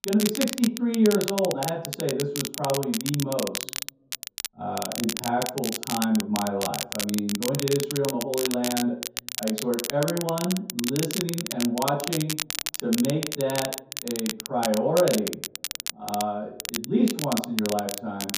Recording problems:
off-mic speech; far
room echo; noticeable; dies away in 0.6 s
crackle, like an old record; loud; 4 dB below the speech

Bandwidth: 15 kHz